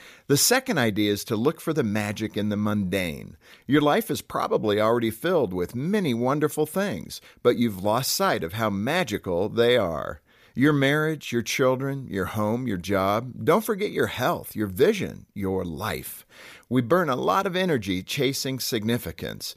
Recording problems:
none

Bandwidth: 15 kHz